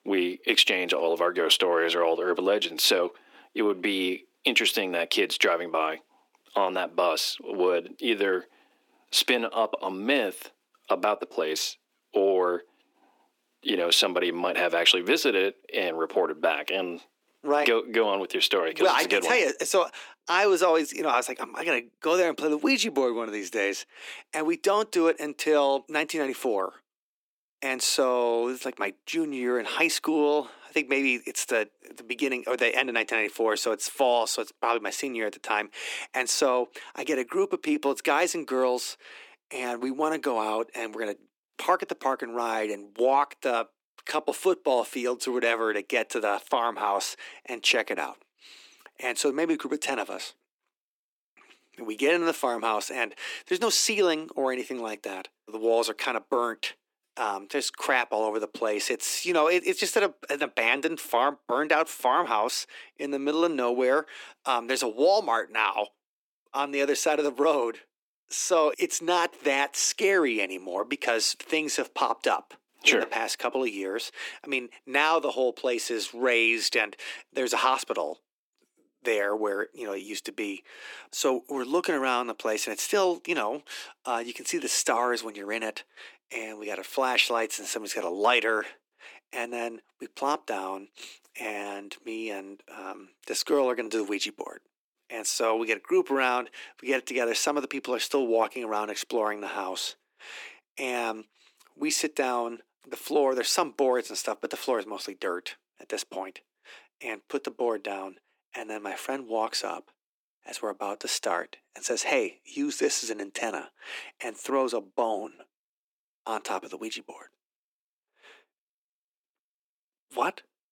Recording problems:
thin; somewhat; fading below 300 Hz

